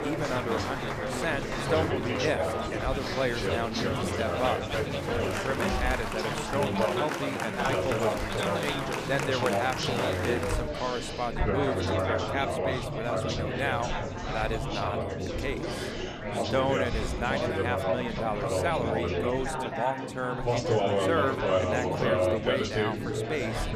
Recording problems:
chatter from many people; very loud; throughout; 3 dB above the speech

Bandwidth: 15 kHz